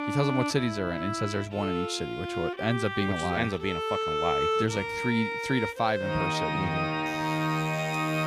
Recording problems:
background music; very loud; throughout; as loud as the speech
alarm; faint; from 7 s on; peak 15 dB below the speech

